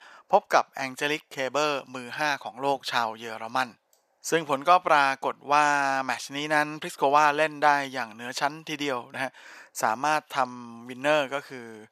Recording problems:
thin; very; fading below 700 Hz

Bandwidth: 14.5 kHz